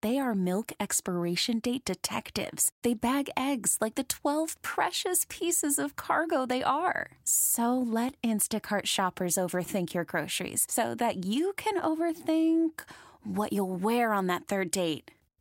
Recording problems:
none

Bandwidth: 16 kHz